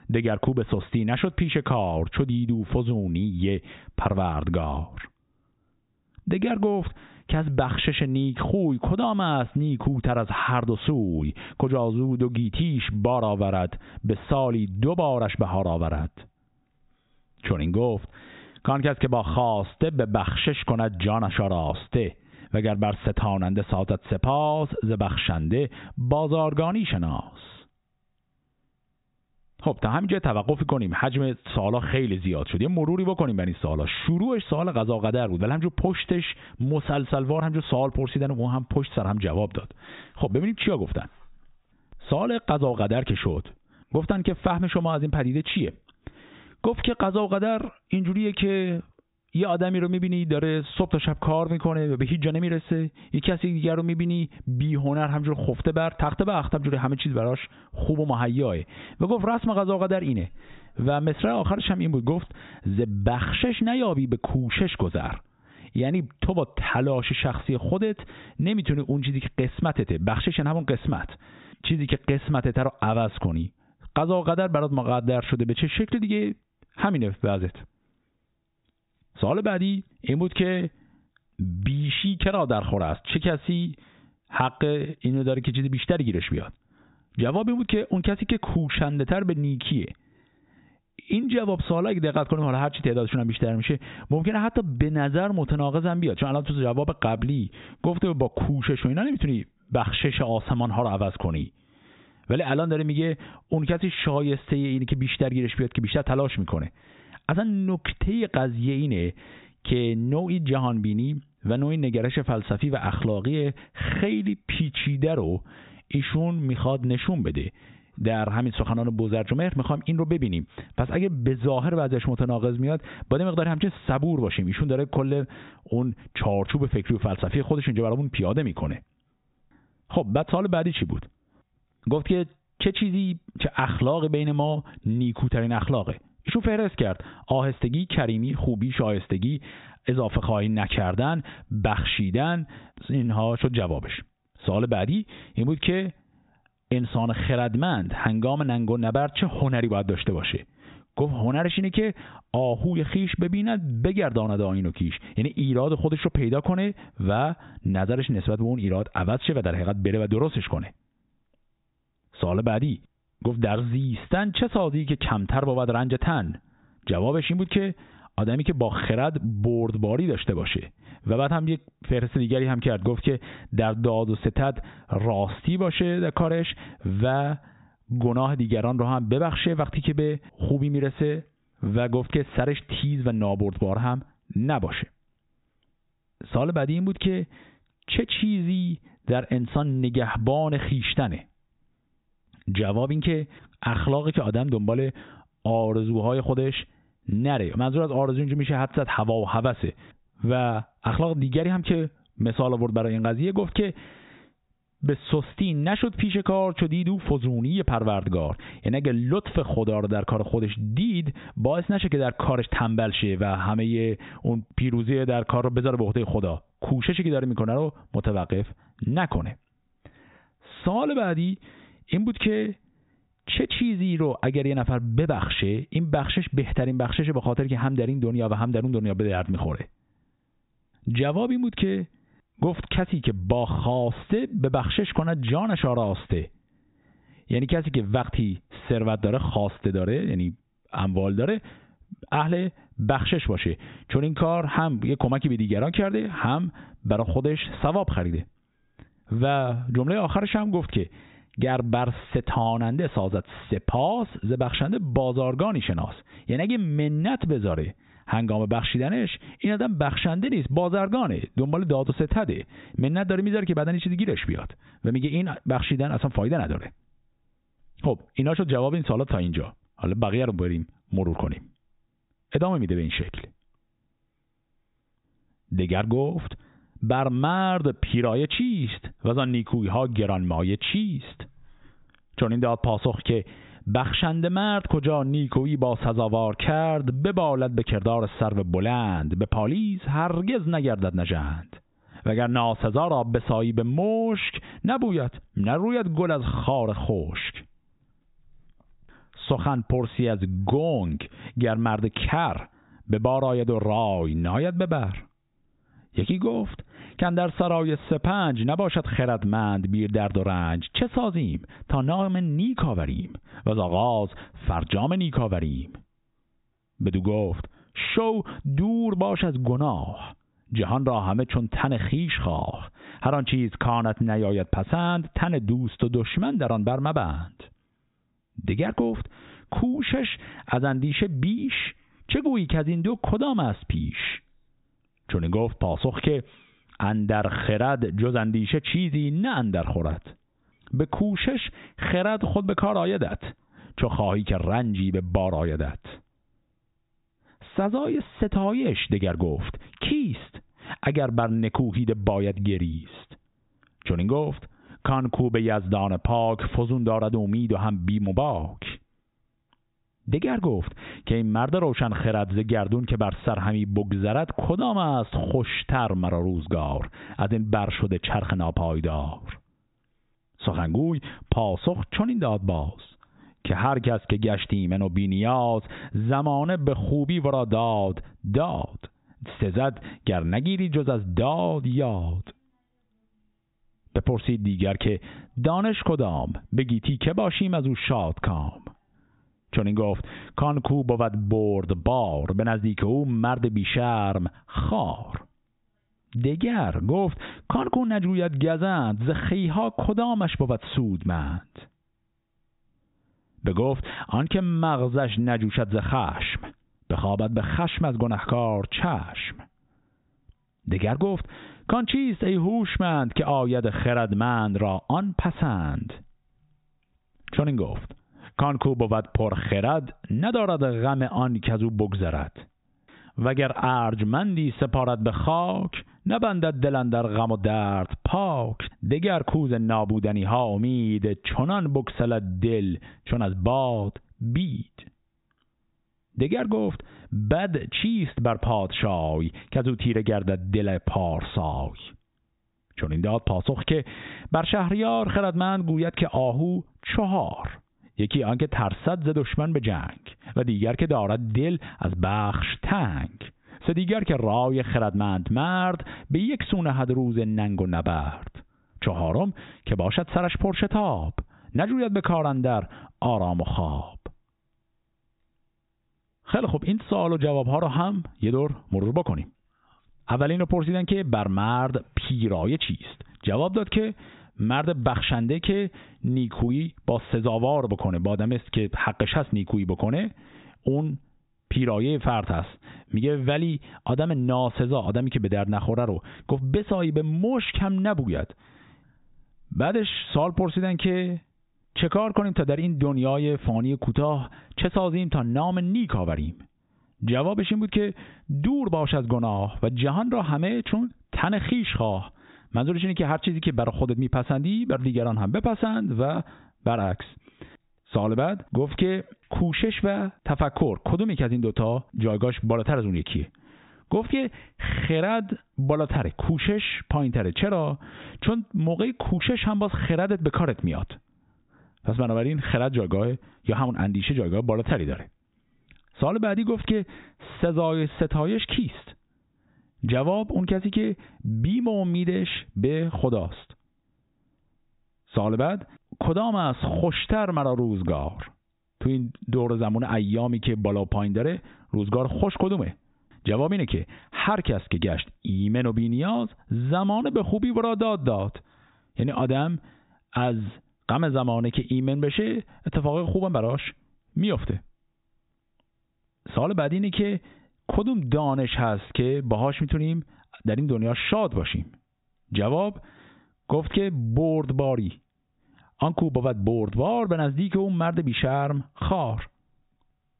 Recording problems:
high frequencies cut off; severe; nothing above 4 kHz
squashed, flat; heavily

